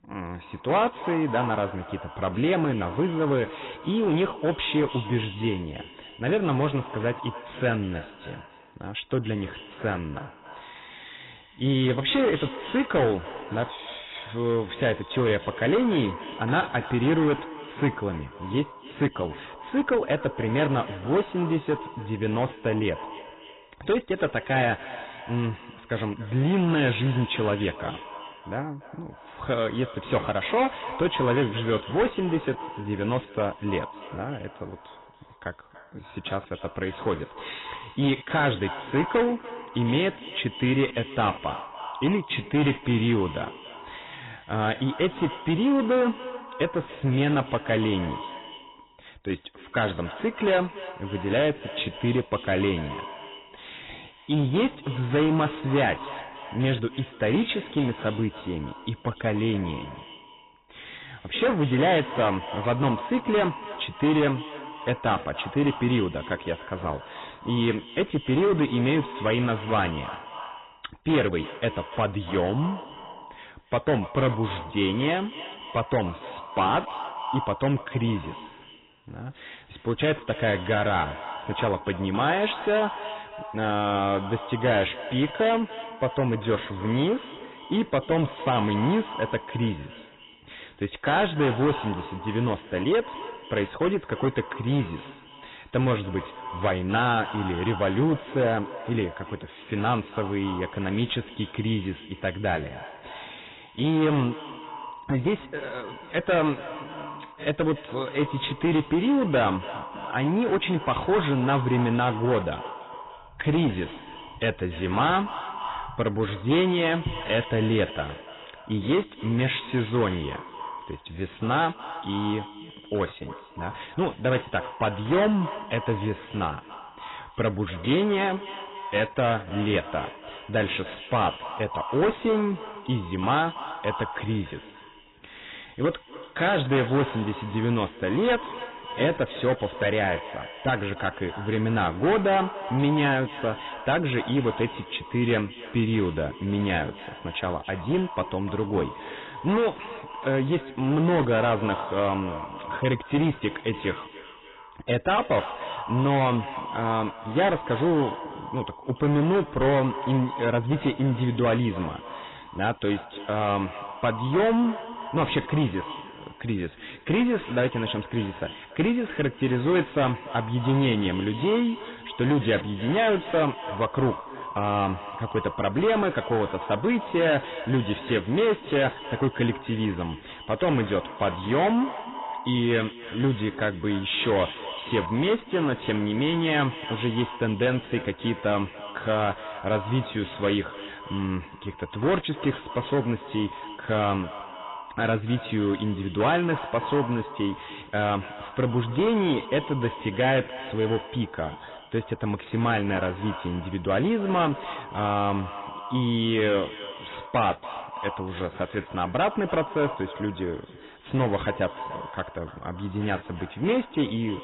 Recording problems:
garbled, watery; badly; nothing above 4 kHz
echo of what is said; noticeable; throughout; 290 ms later, 15 dB below the speech
distortion; slight; 7% of the sound clipped

